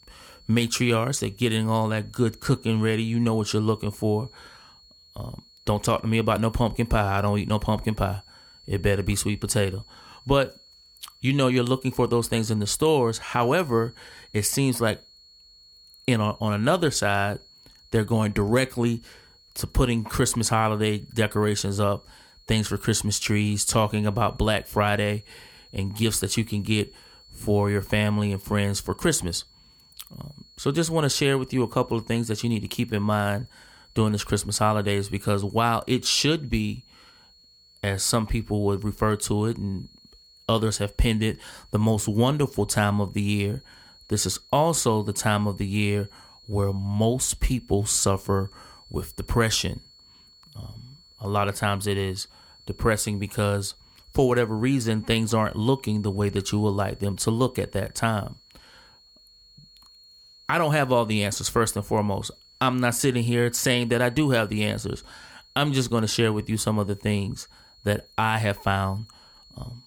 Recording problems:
high-pitched whine; faint; throughout; 4.5 kHz, 25 dB below the speech

